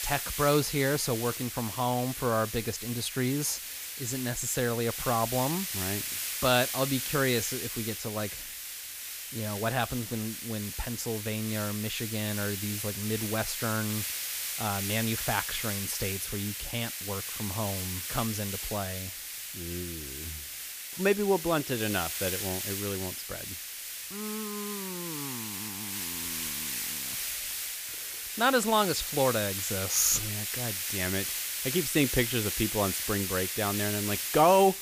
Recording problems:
hiss; loud; throughout; 3 dB below the speech

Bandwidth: 15 kHz